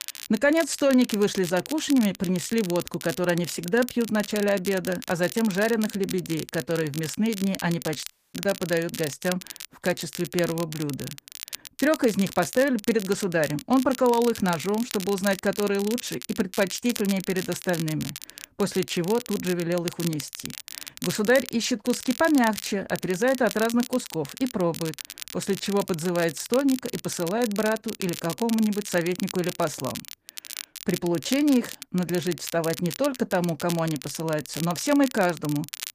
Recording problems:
garbled, watery; slightly; nothing above 15 kHz
crackle, like an old record; noticeable; 10 dB below the speech
audio cutting out; at 8 s

